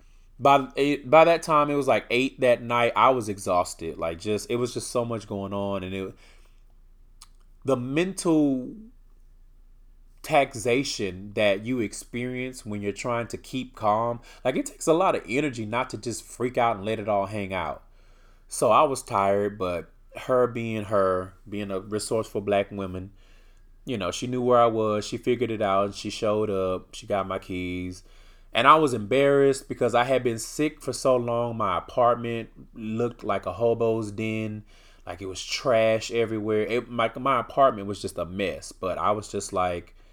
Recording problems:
none

